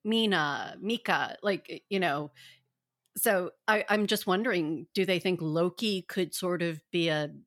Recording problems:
none

